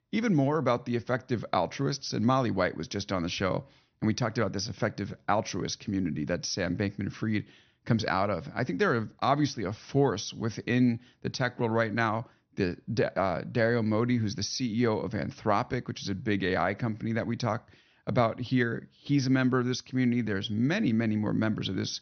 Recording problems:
high frequencies cut off; noticeable; nothing above 6 kHz

